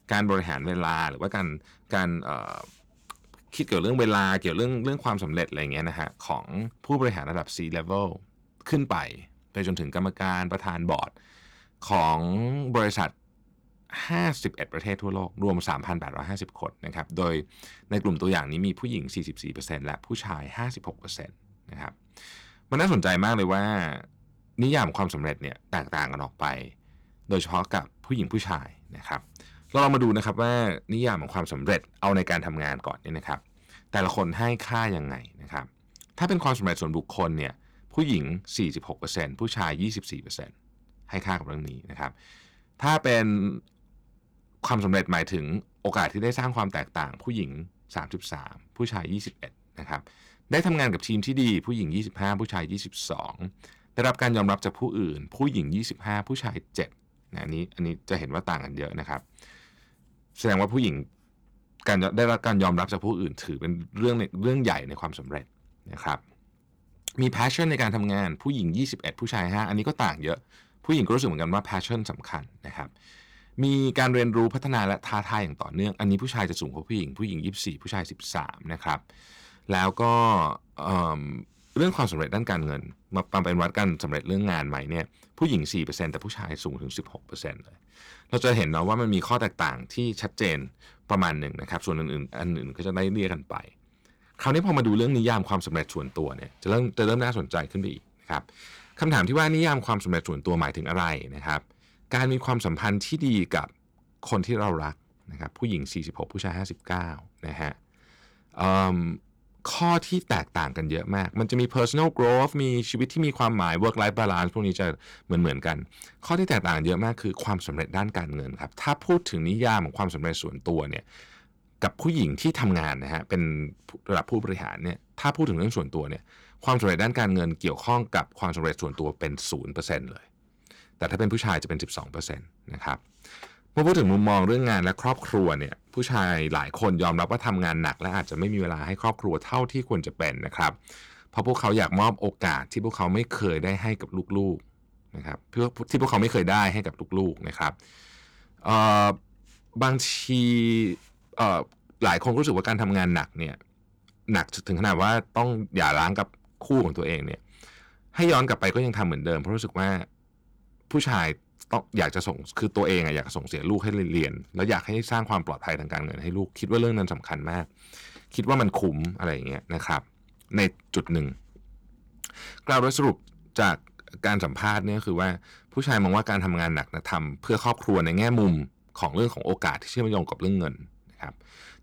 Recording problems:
distortion; slight; 2% of the sound clipped

